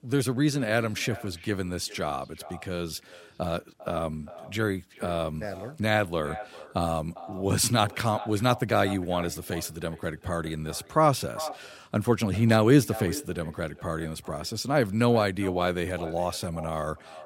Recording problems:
echo of what is said; noticeable; throughout; 400 ms later, 15 dB below the speech

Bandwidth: 16 kHz